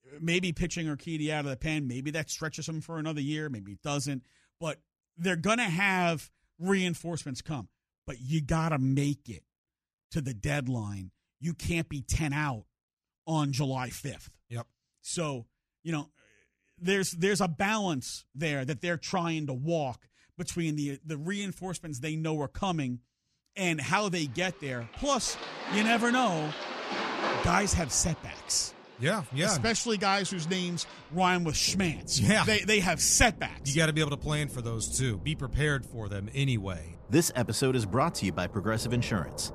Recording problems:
rain or running water; noticeable; from 24 s on; 10 dB below the speech

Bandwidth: 14.5 kHz